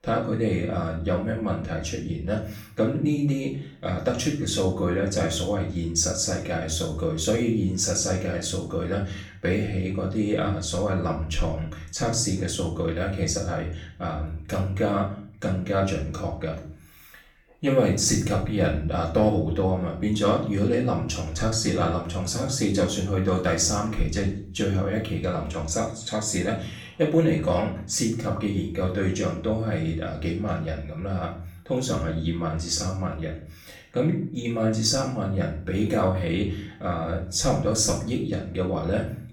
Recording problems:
off-mic speech; far
room echo; slight; dies away in 0.5 s

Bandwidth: 18 kHz